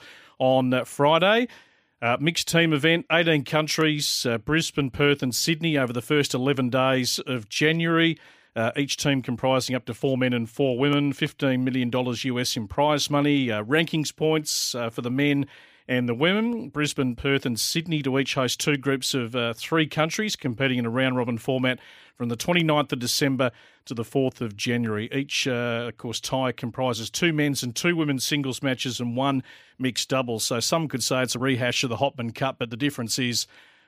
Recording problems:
uneven, jittery; slightly; from 4.5 to 33 s

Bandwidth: 15 kHz